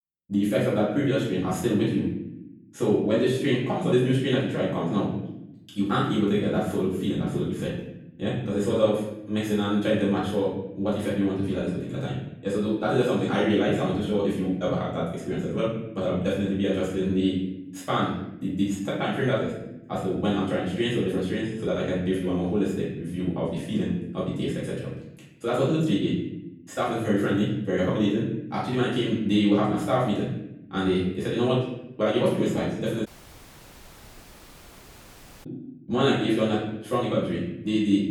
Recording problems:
off-mic speech; far
wrong speed, natural pitch; too fast; 1.7 times normal speed
room echo; noticeable; dies away in 0.8 s
audio cutting out; at 33 s for 2.5 s

